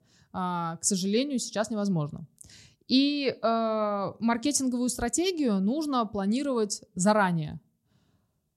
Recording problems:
none

